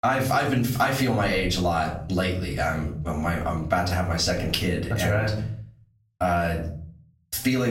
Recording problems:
off-mic speech; far
room echo; slight; dies away in 0.4 s
squashed, flat; somewhat
abrupt cut into speech; at the end

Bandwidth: 16 kHz